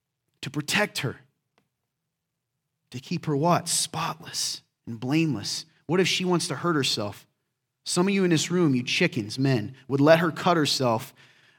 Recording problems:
none

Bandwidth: 17.5 kHz